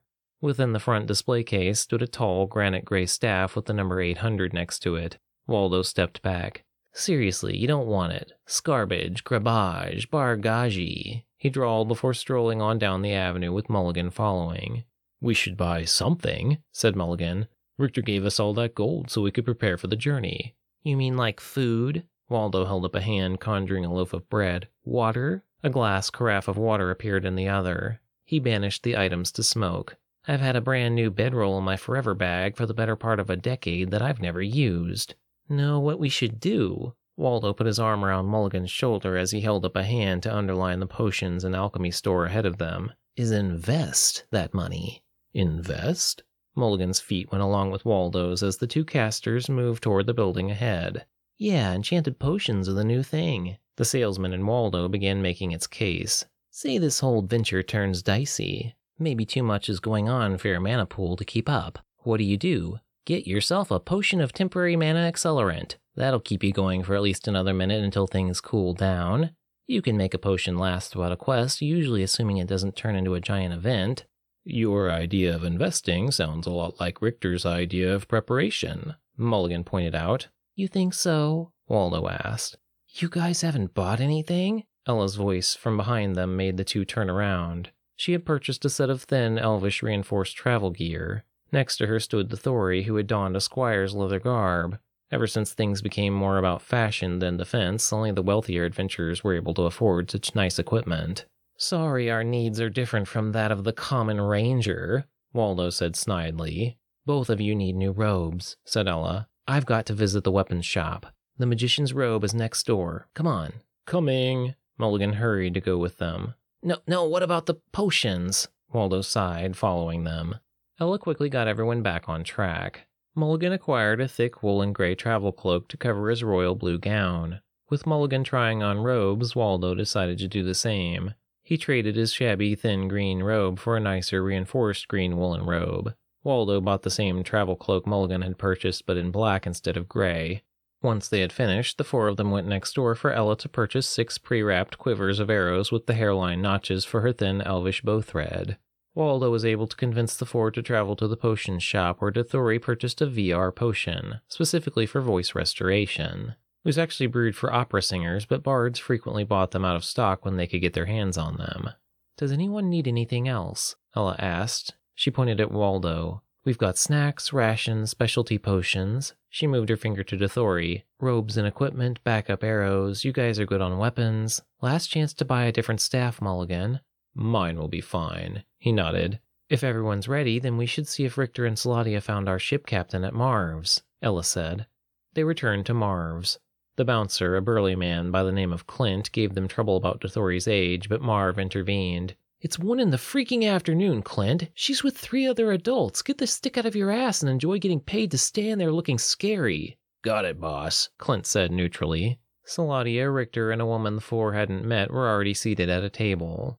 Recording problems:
none

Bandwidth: 18.5 kHz